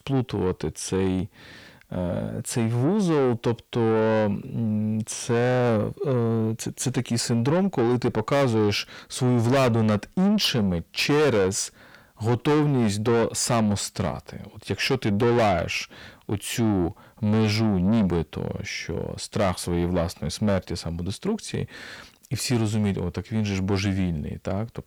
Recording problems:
distortion; heavy; 7 dB below the speech

